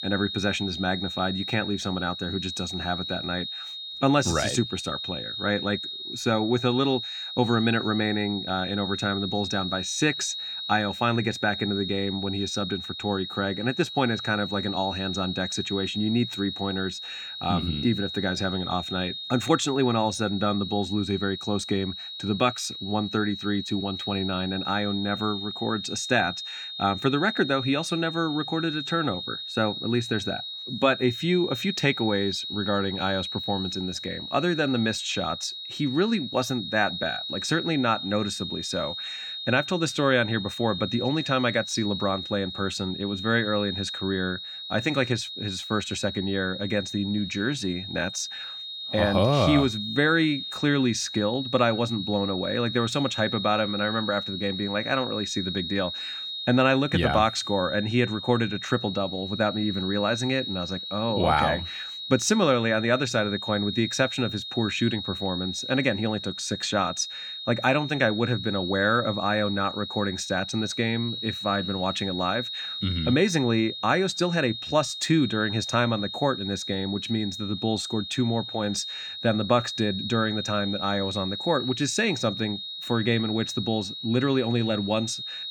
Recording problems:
high-pitched whine; loud; throughout; 3.5 kHz, 6 dB below the speech

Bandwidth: 18 kHz